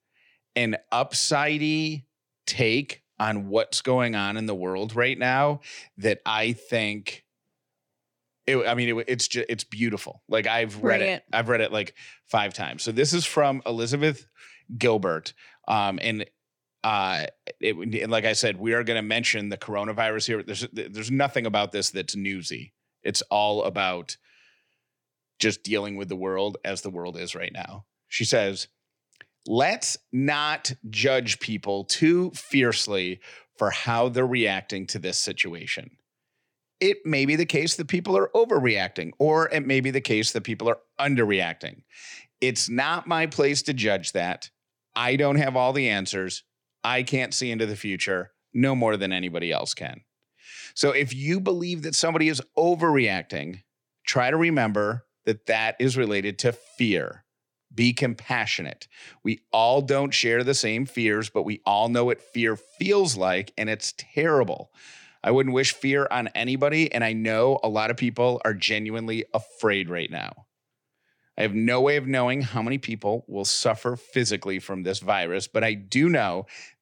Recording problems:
none

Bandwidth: 18.5 kHz